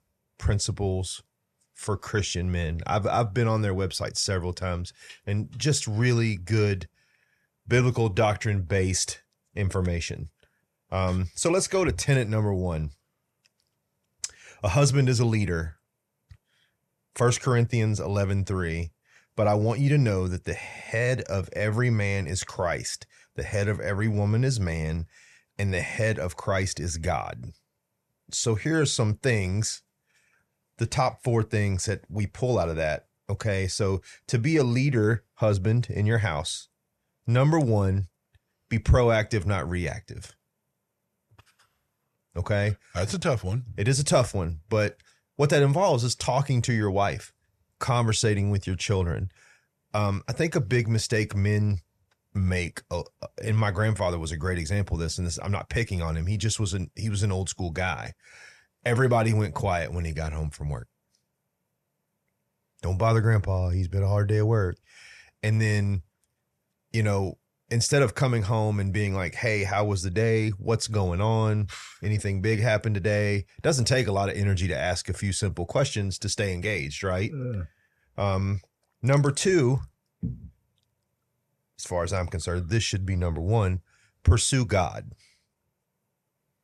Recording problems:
none

